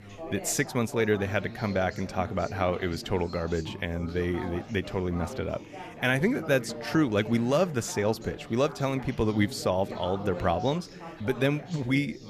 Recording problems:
chatter from many people; noticeable; throughout; 10 dB below the speech

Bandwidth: 14.5 kHz